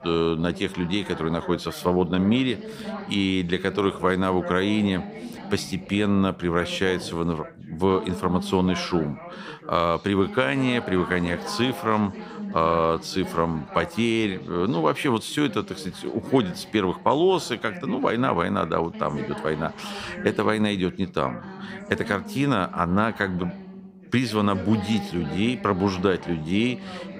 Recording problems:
background chatter; noticeable; throughout; 2 voices, 15 dB below the speech

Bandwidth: 15.5 kHz